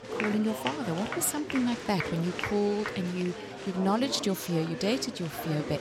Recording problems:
chatter from many people; loud; throughout; 6 dB below the speech

